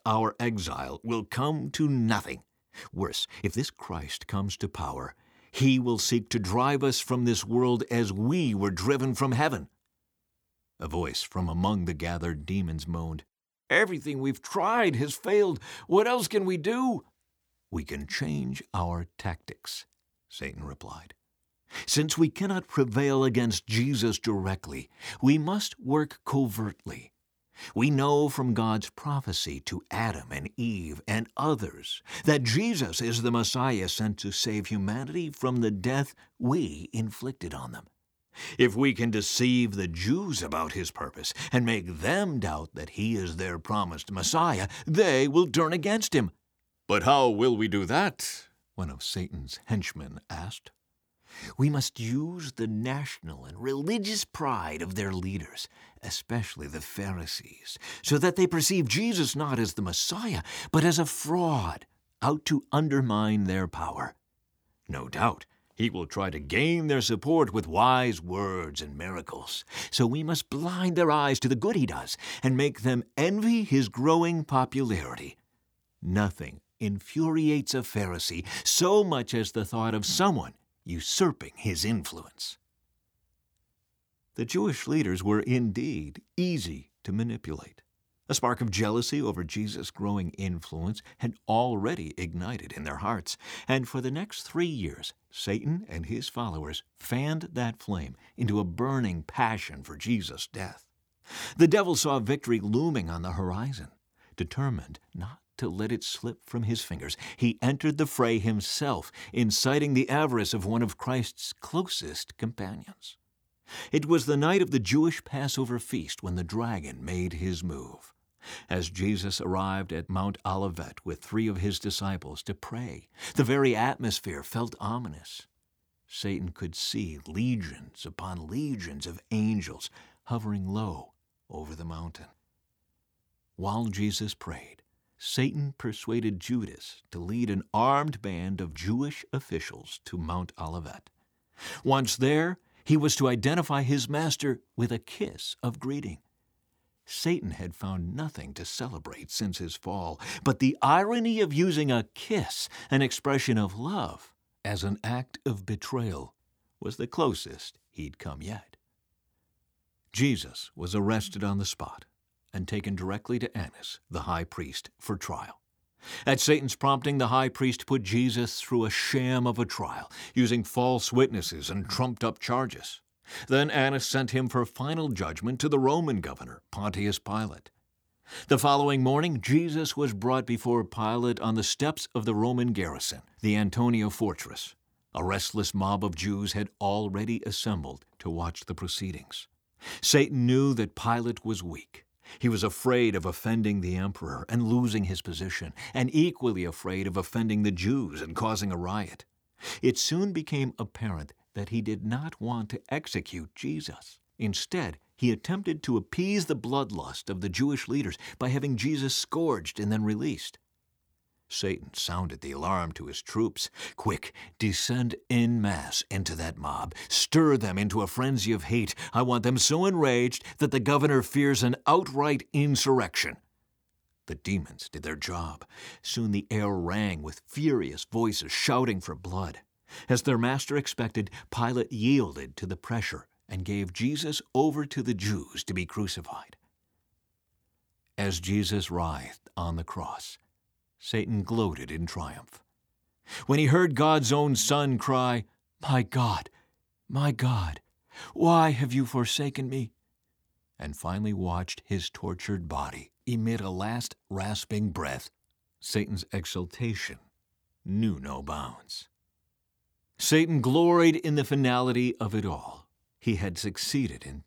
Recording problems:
uneven, jittery; strongly; from 2.5 s to 4:17

